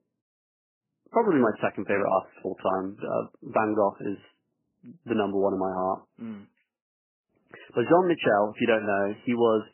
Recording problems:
garbled, watery; badly; nothing above 3 kHz

